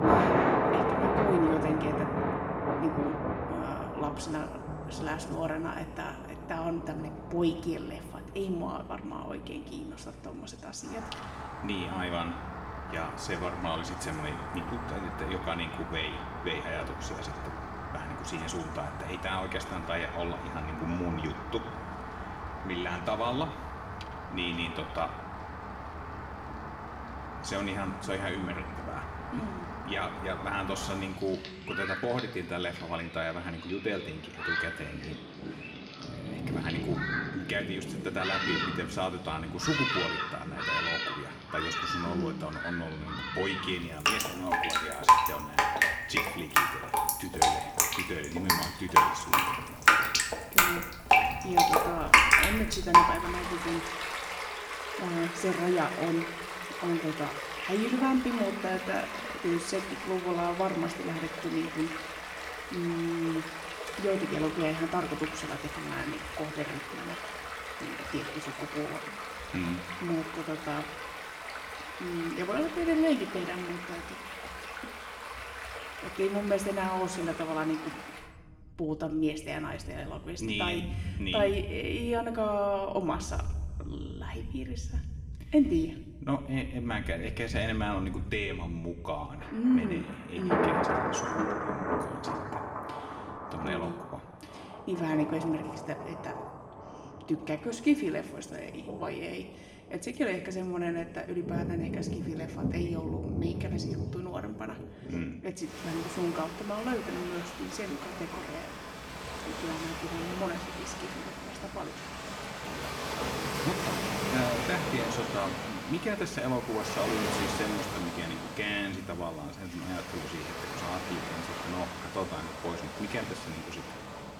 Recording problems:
room echo; slight; dies away in 2.2 s
off-mic speech; somewhat distant
rain or running water; very loud; throughout; 2 dB above the speech

